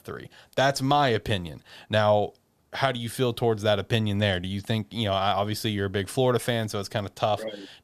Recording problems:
none

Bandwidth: 14 kHz